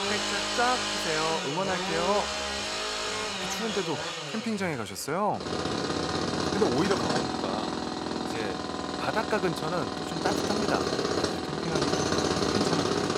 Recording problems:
machinery noise; very loud; throughout; 3 dB above the speech

